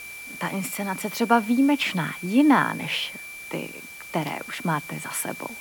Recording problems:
high-pitched whine; noticeable; throughout; 2.5 kHz, 15 dB below the speech
hiss; noticeable; throughout; 20 dB below the speech

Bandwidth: 18 kHz